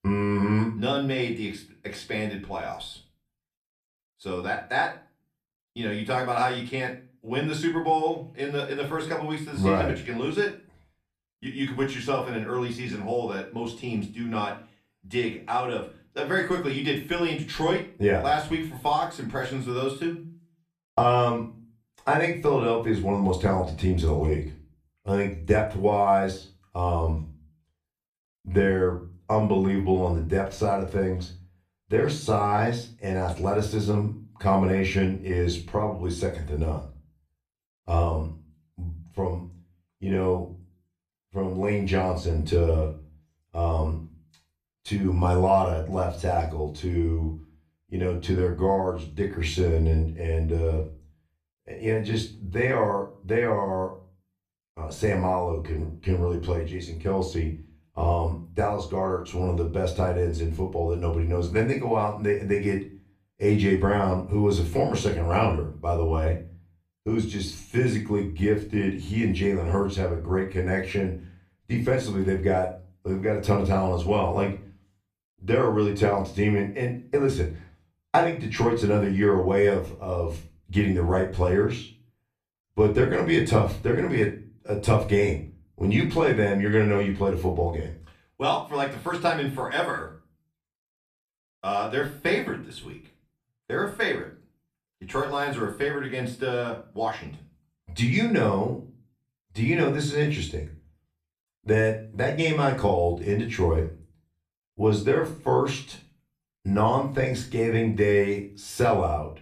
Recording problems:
off-mic speech; far
room echo; slight; dies away in 0.3 s

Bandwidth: 14.5 kHz